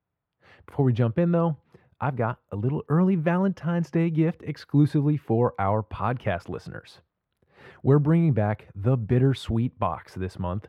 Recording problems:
muffled; very; fading above 3 kHz

